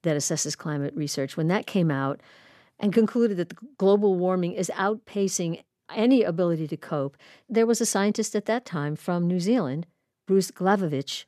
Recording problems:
none

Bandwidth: 13.5 kHz